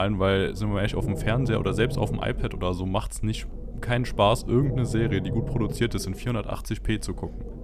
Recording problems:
low rumble; noticeable; throughout; 10 dB below the speech
abrupt cut into speech; at the start

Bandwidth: 14.5 kHz